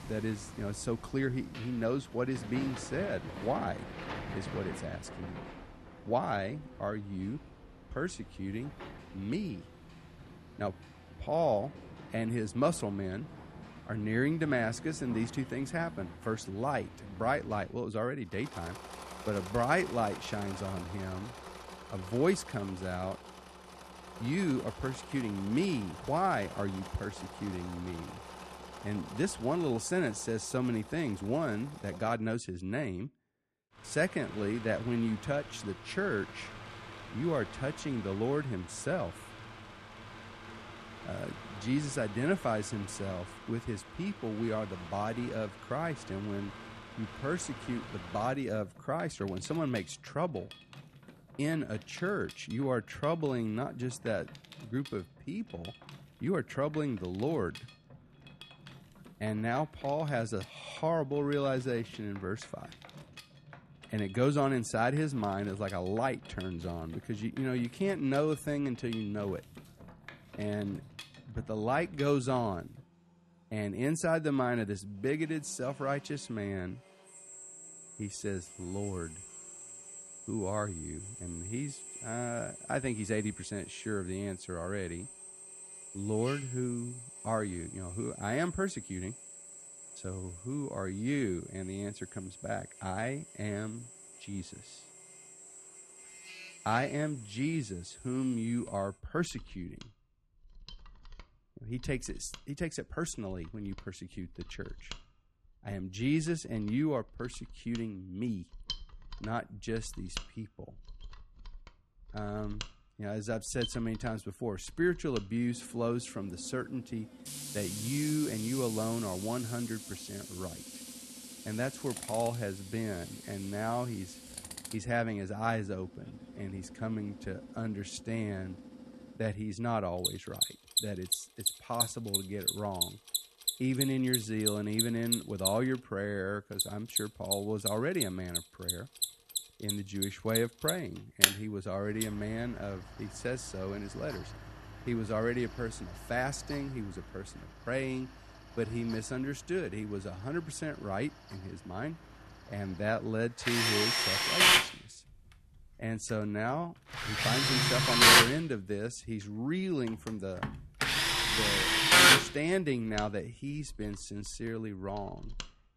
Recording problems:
machinery noise; very loud; throughout; 2 dB above the speech

